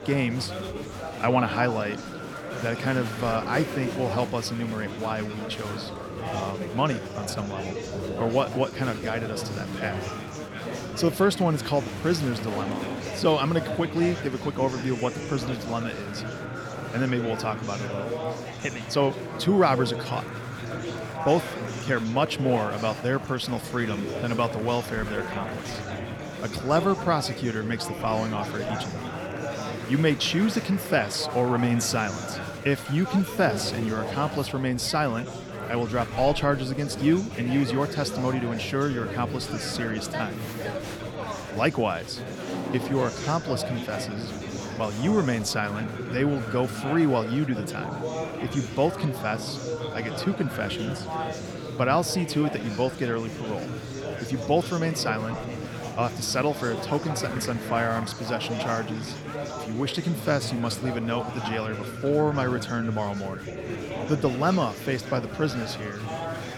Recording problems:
murmuring crowd; loud; throughout; 6 dB below the speech

